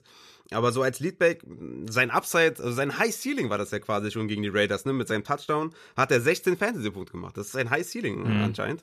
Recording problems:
none

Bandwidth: 14 kHz